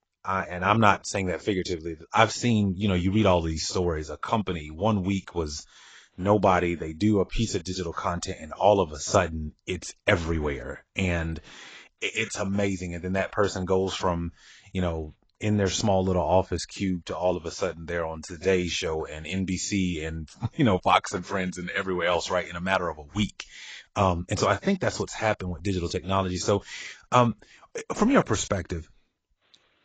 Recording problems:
garbled, watery; badly; nothing above 7.5 kHz

